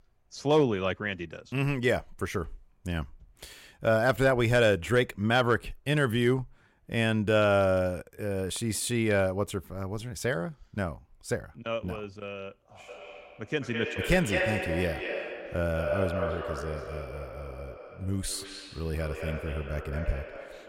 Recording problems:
echo of what is said; strong; from 13 s on; 210 ms later, 6 dB below the speech

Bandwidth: 16 kHz